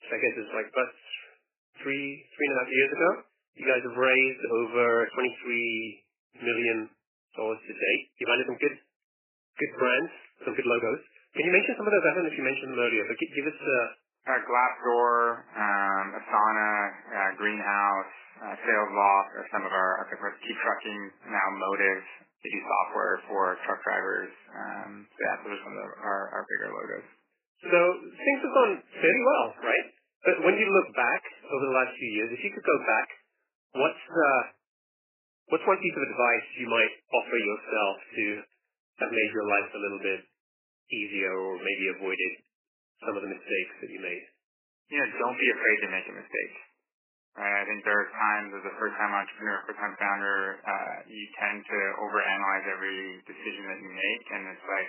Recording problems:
garbled, watery; badly; nothing above 2.5 kHz
thin; somewhat; fading below 300 Hz
uneven, jittery; strongly; from 5 to 51 s

